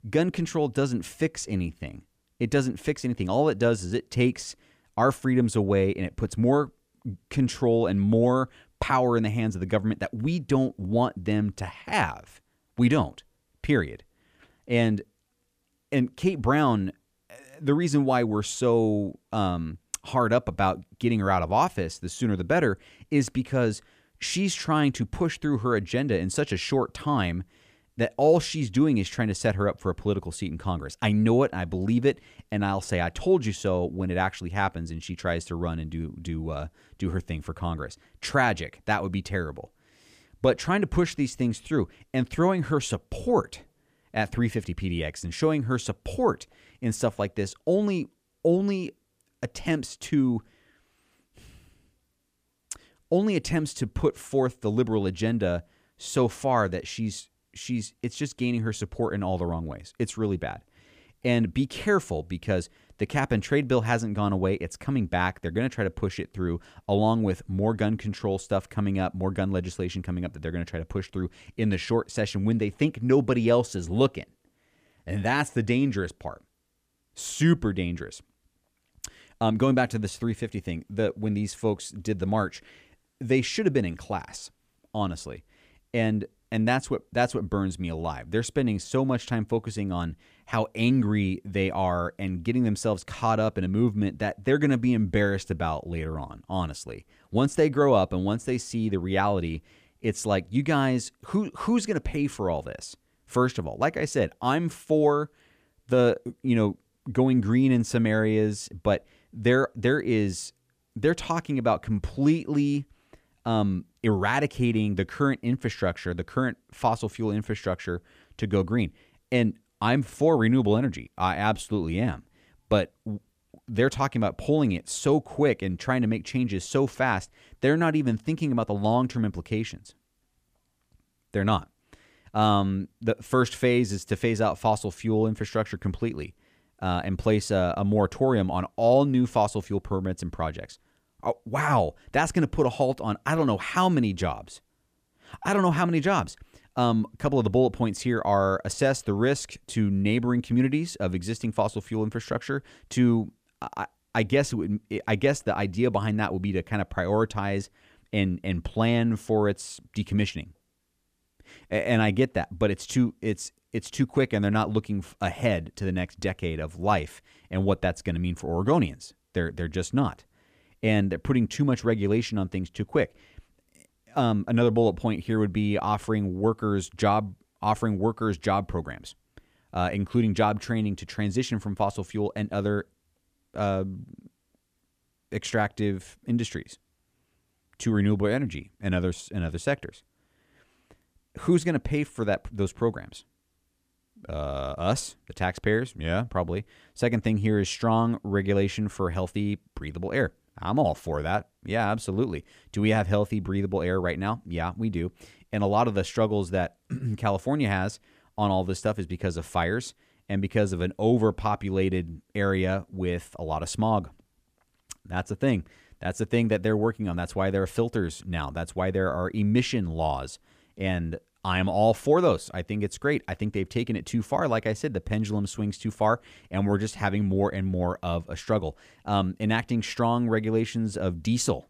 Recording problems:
none

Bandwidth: 15 kHz